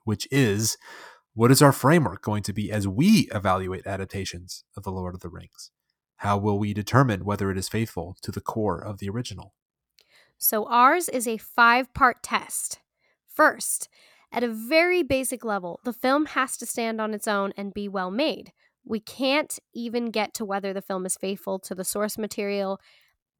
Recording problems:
none

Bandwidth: 19 kHz